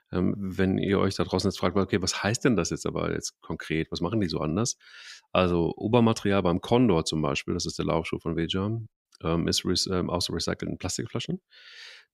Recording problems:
none

